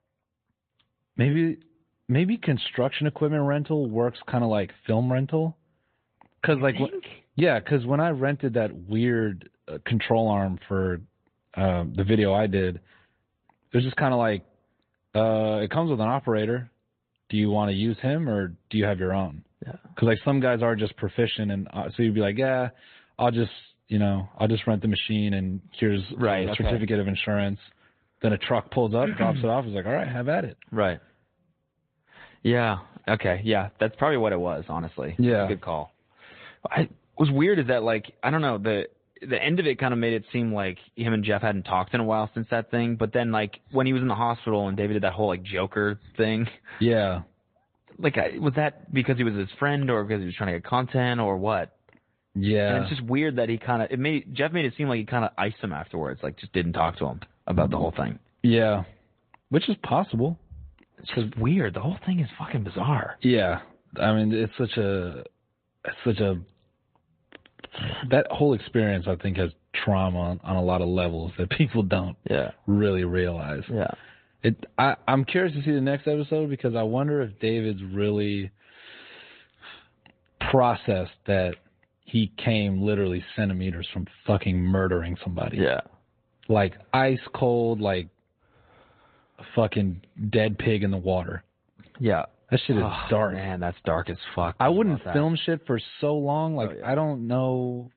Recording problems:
high frequencies cut off; severe; nothing above 4 kHz
garbled, watery; slightly

